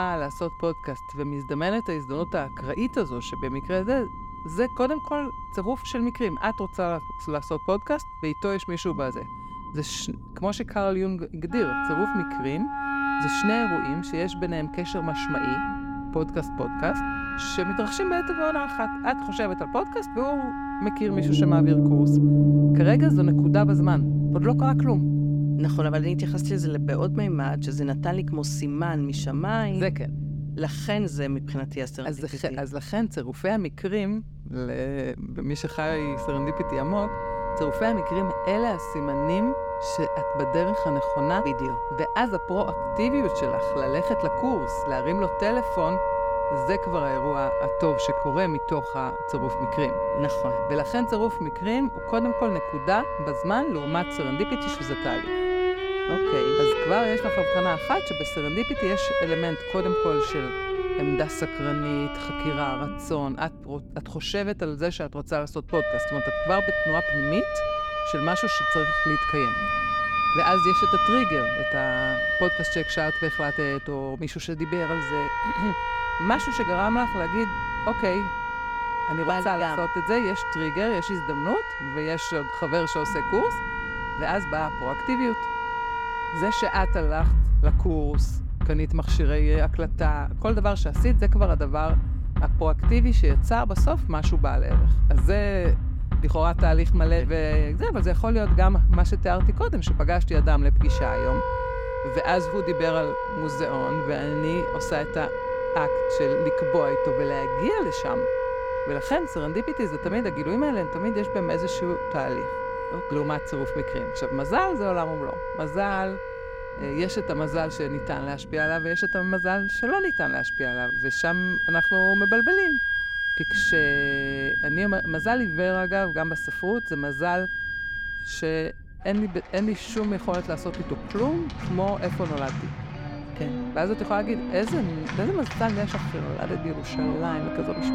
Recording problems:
background music; very loud; throughout; 3 dB above the speech
low rumble; faint; throughout; 25 dB below the speech
abrupt cut into speech; at the start

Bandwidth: 17 kHz